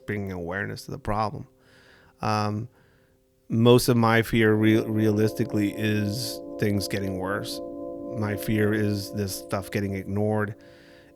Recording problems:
background music; noticeable; throughout; 15 dB below the speech

